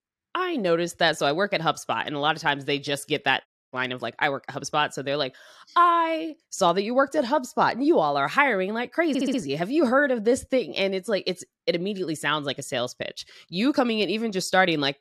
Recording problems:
audio cutting out; at 3.5 s
audio stuttering; at 9 s

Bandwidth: 13.5 kHz